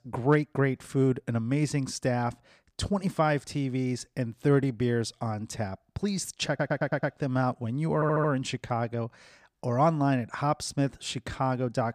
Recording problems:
audio stuttering; at 6.5 s and at 8 s

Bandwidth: 15 kHz